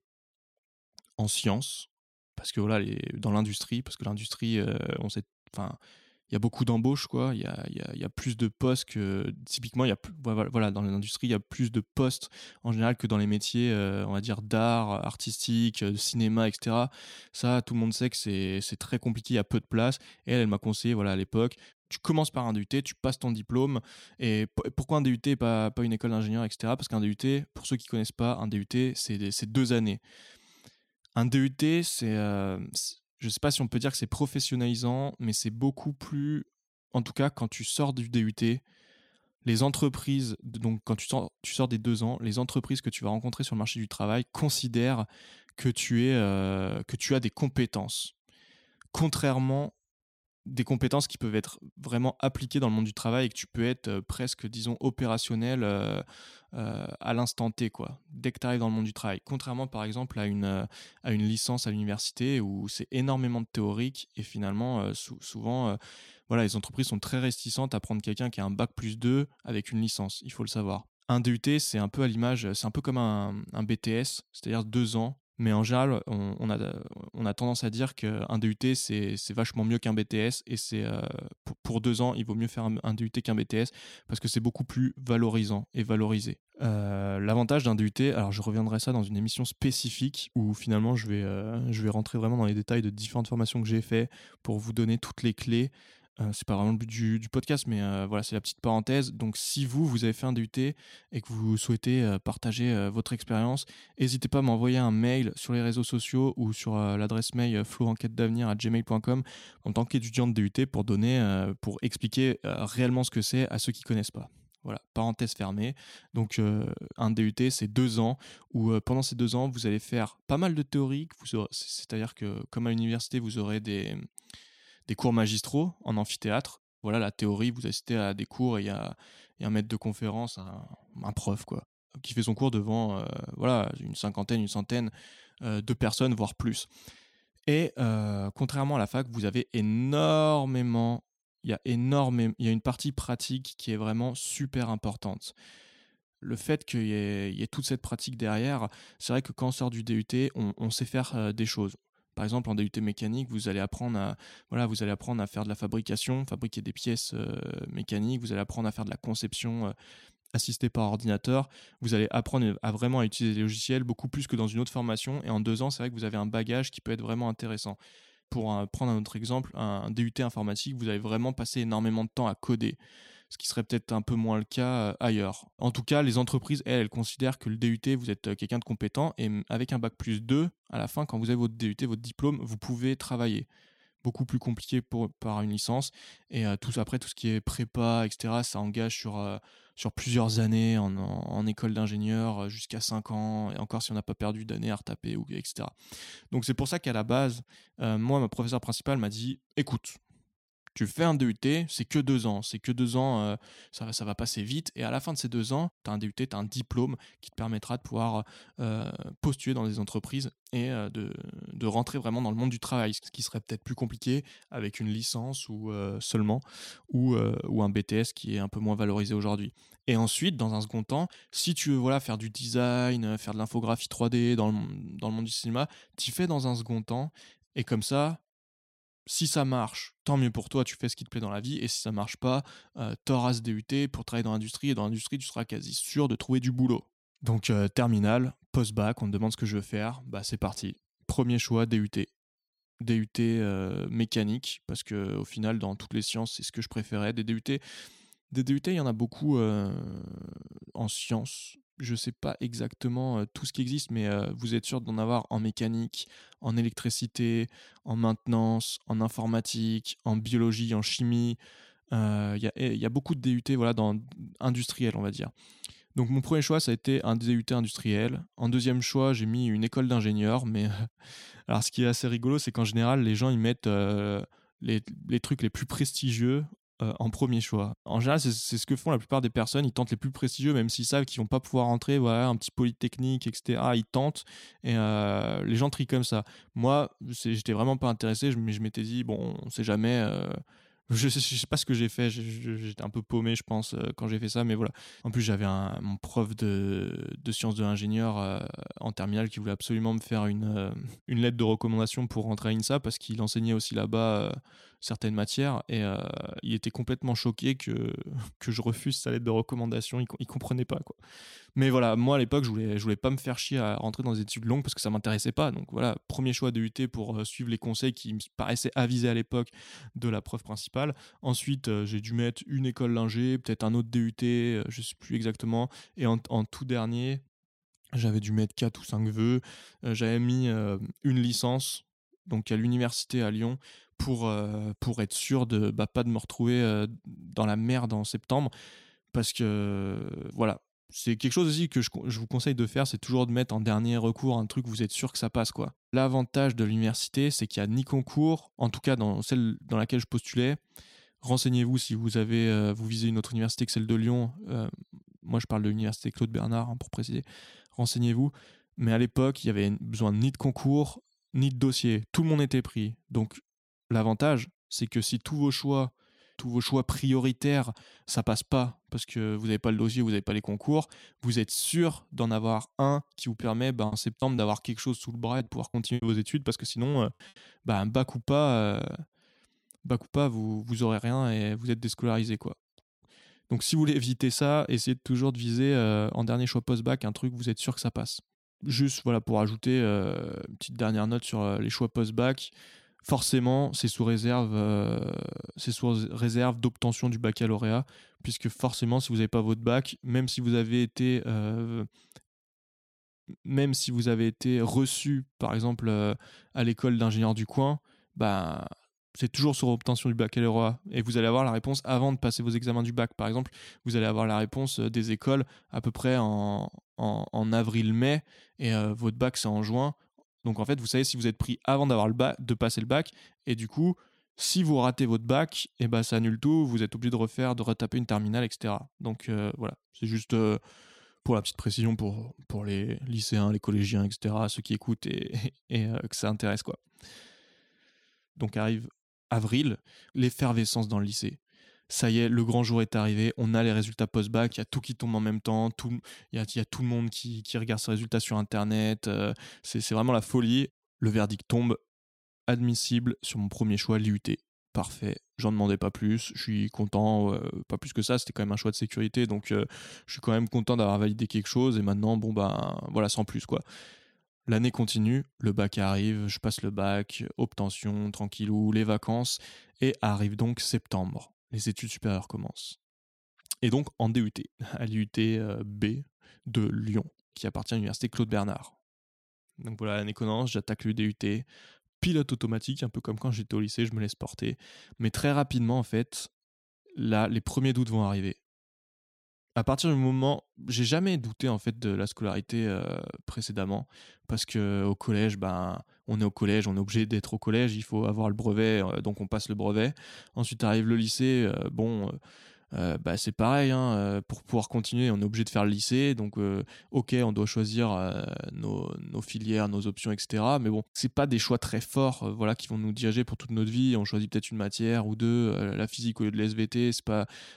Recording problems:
choppy; very; from 6:14 to 6:17; 9% of the speech affected

